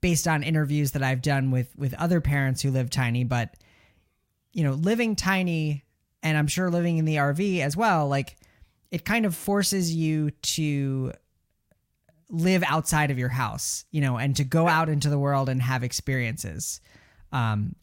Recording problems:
none

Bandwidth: 16 kHz